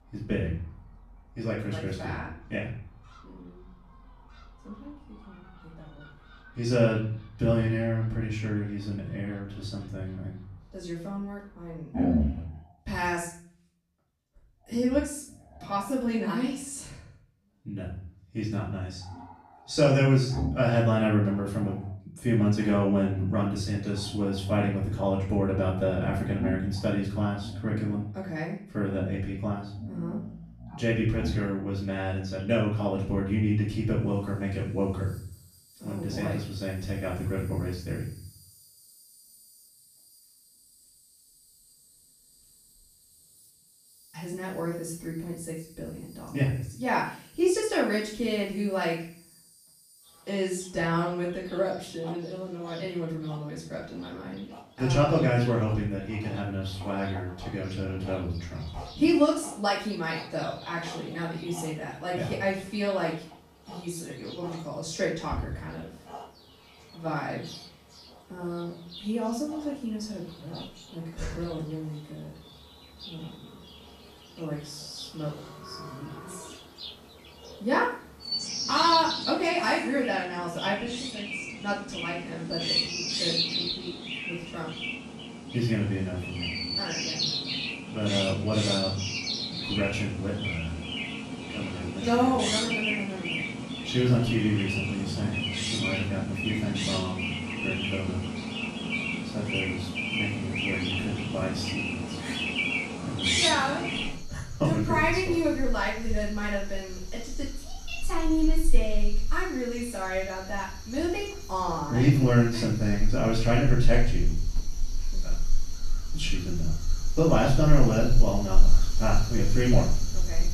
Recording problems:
off-mic speech; far
room echo; noticeable; dies away in 0.5 s
animal sounds; loud; throughout; 3 dB below the speech

